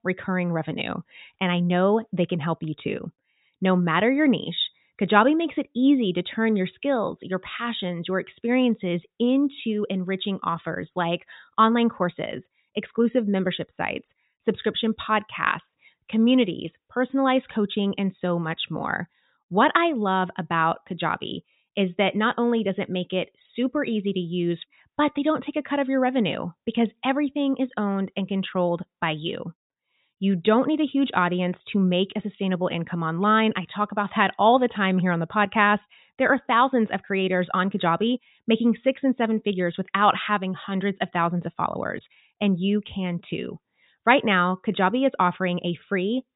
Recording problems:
high frequencies cut off; severe; nothing above 4 kHz

